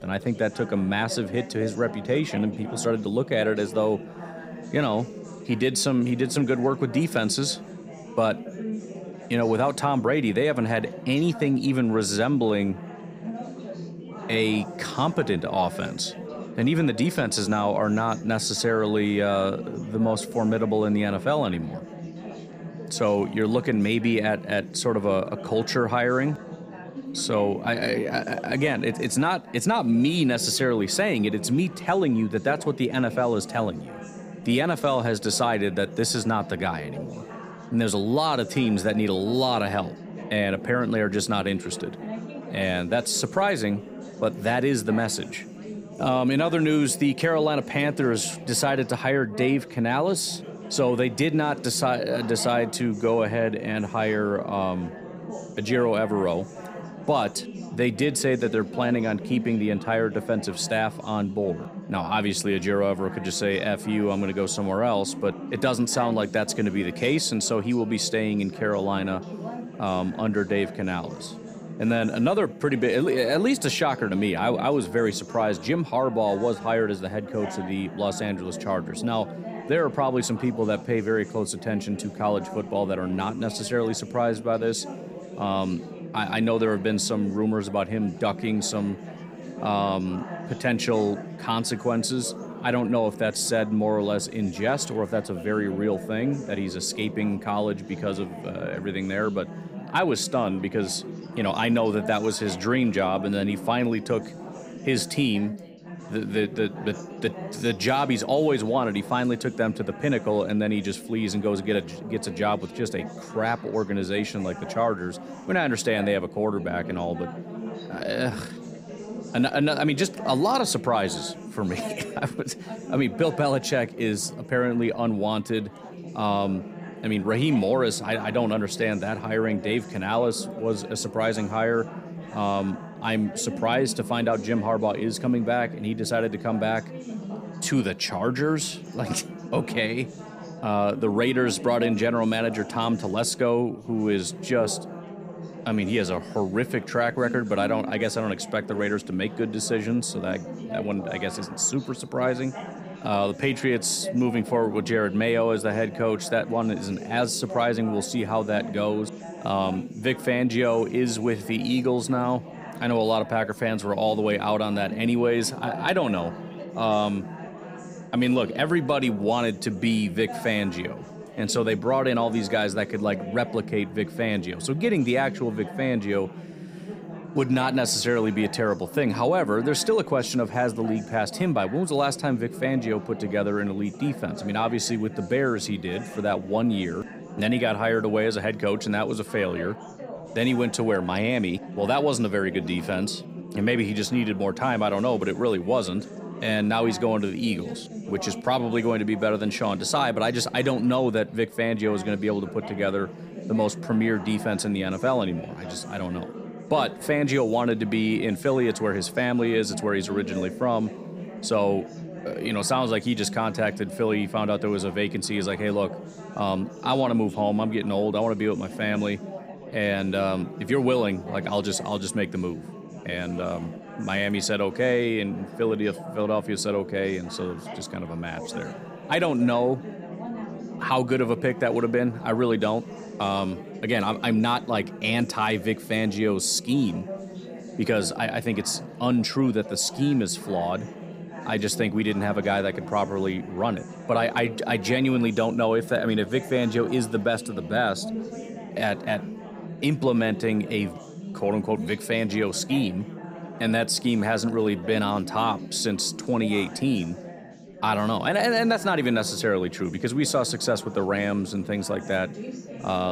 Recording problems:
chatter from many people; noticeable; throughout; 10 dB below the speech
abrupt cut into speech; at the end

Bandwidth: 15.5 kHz